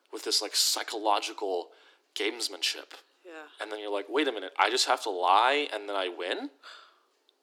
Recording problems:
thin; somewhat; fading below 300 Hz

